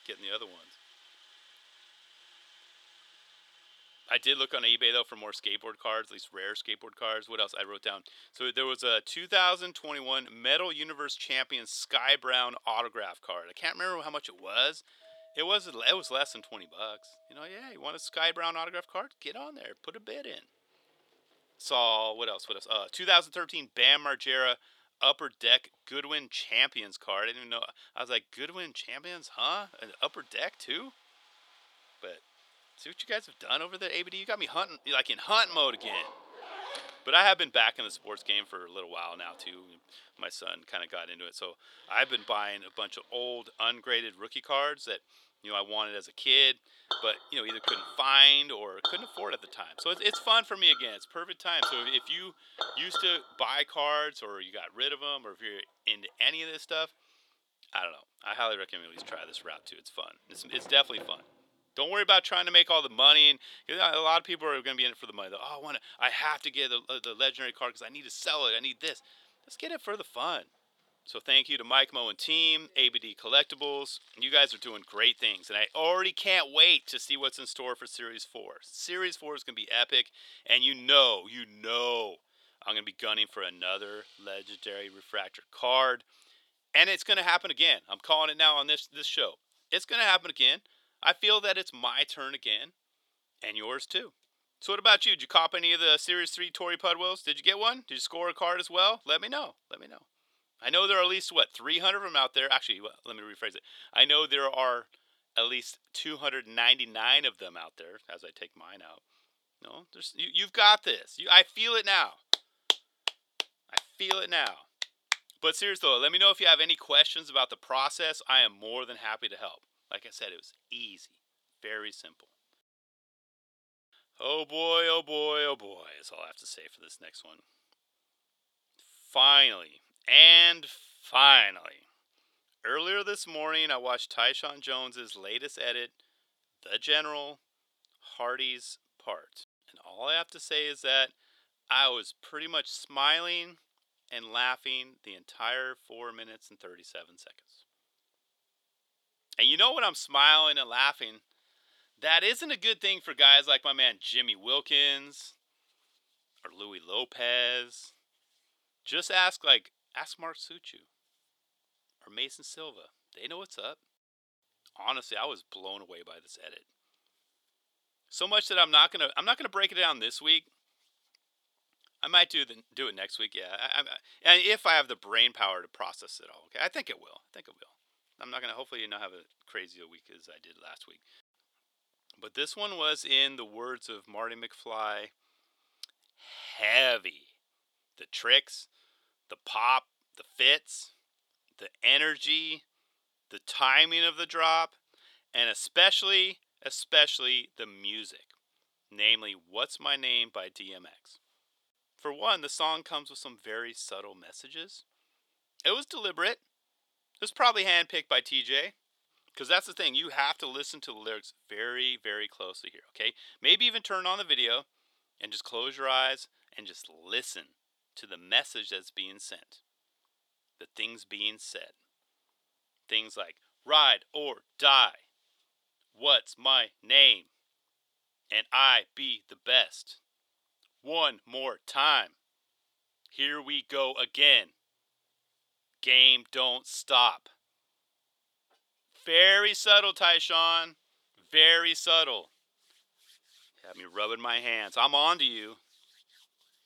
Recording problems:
thin; somewhat; fading below 550 Hz
household noises; noticeable; until 1:25; 15 dB below the speech

